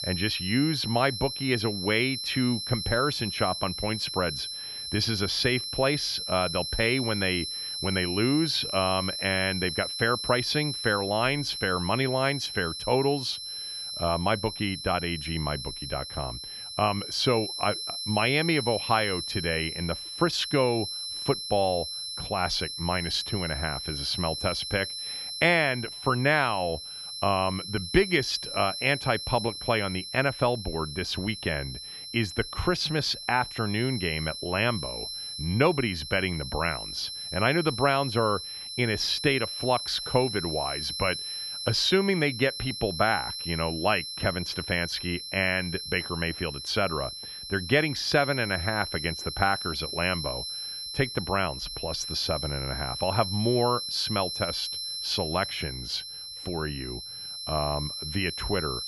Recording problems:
high-pitched whine; loud; throughout; 4 kHz, 6 dB below the speech

